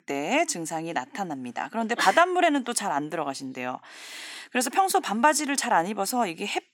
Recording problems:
thin; somewhat; fading below 400 Hz

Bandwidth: 17.5 kHz